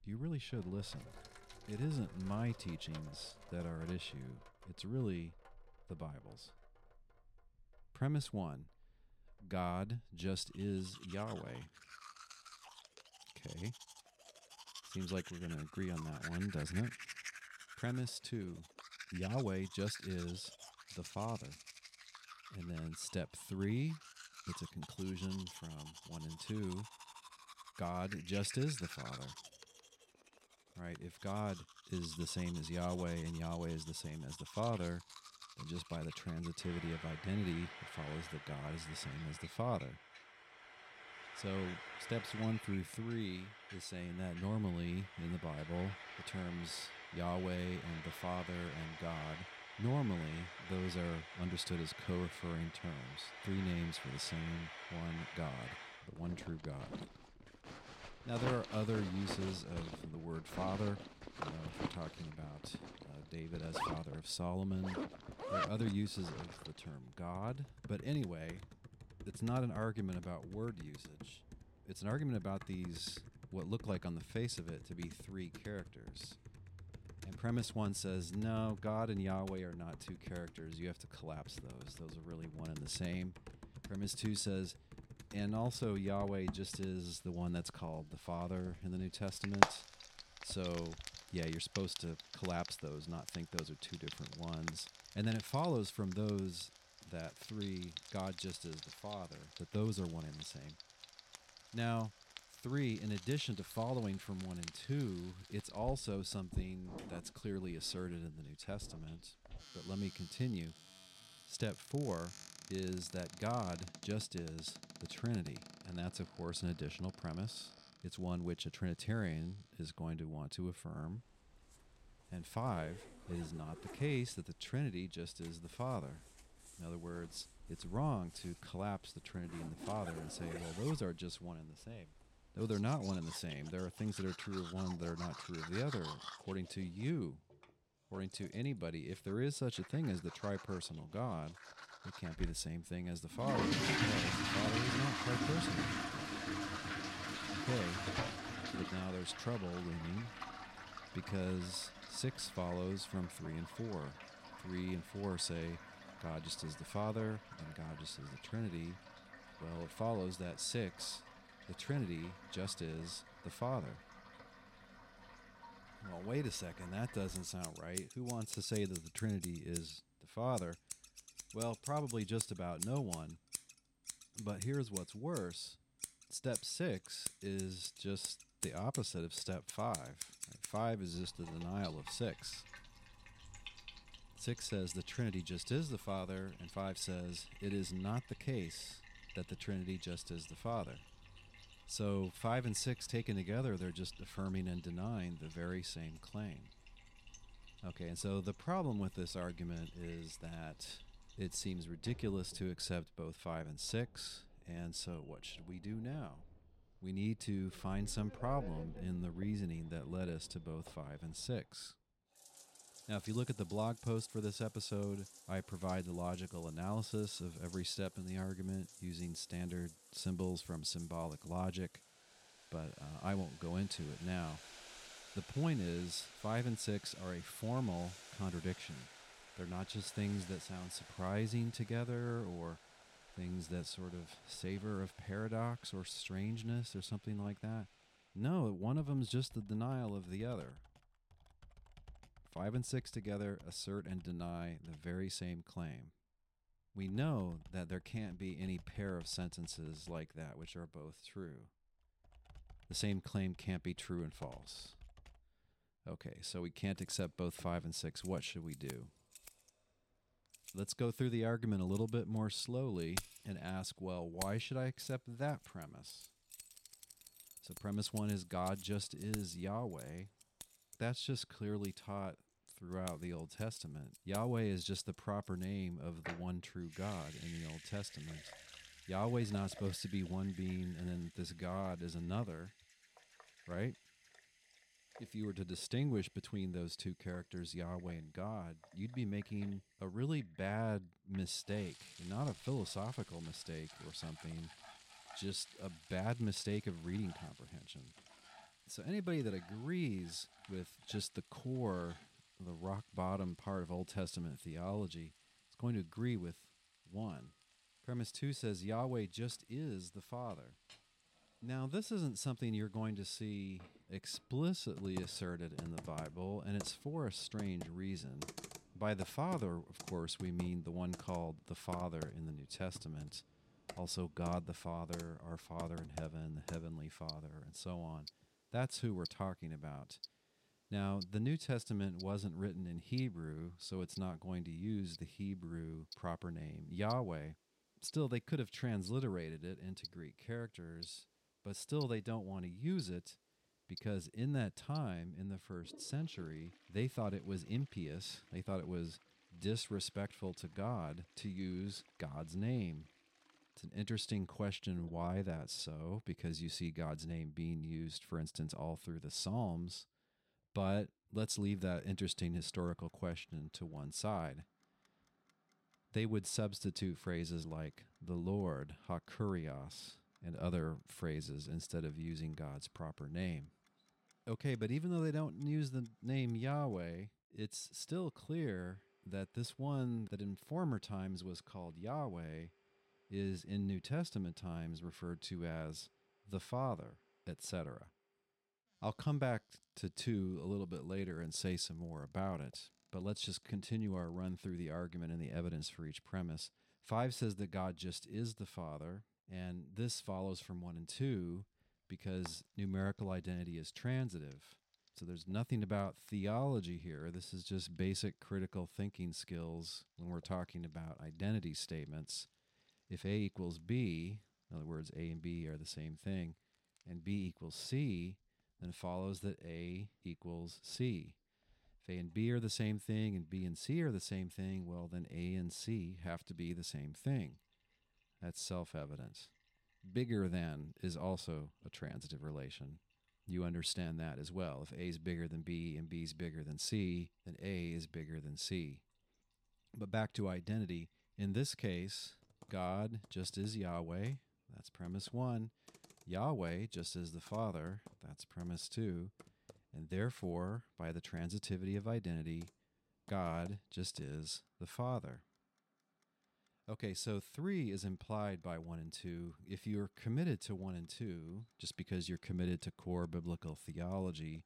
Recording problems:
household noises; loud; throughout; 8 dB below the speech

